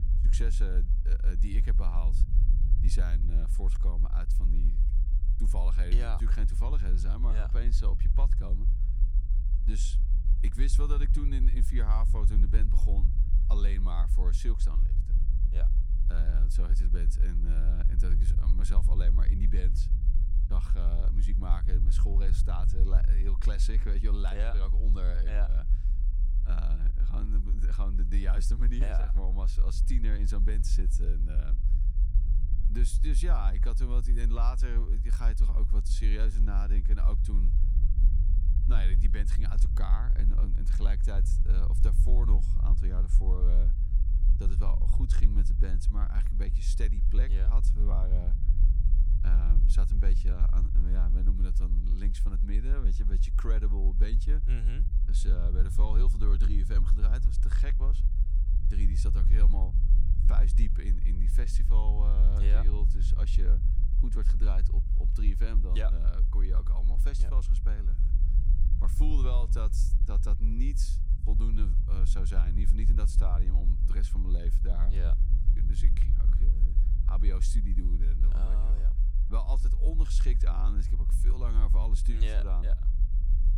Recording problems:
low rumble; loud; throughout; 6 dB below the speech

